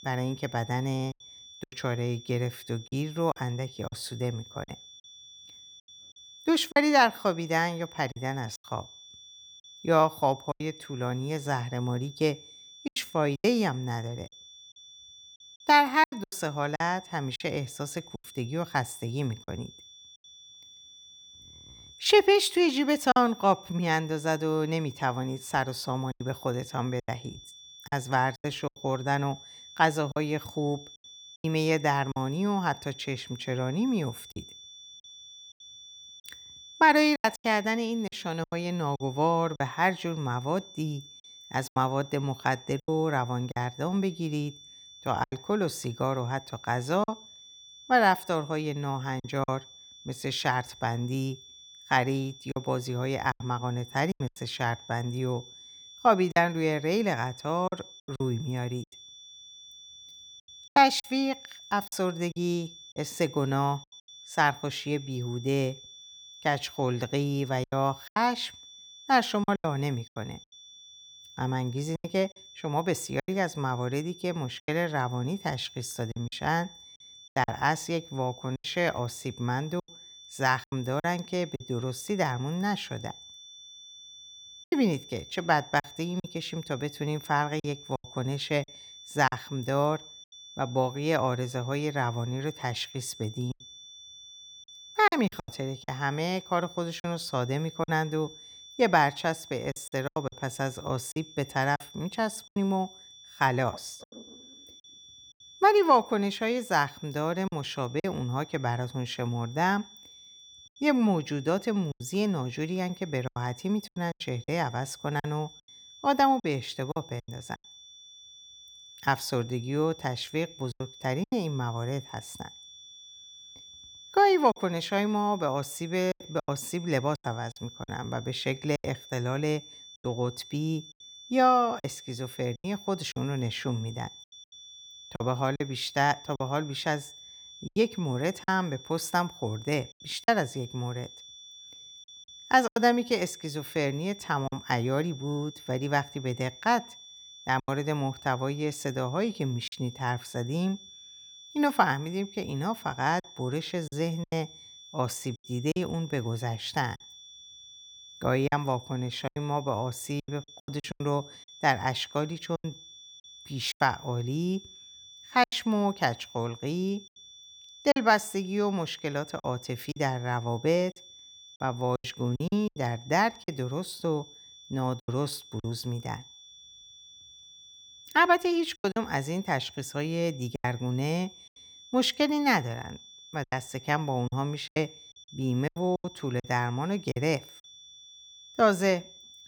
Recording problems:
high-pitched whine; noticeable; throughout; 3.5 kHz, 20 dB below the speech
choppy; very; 7% of the speech affected

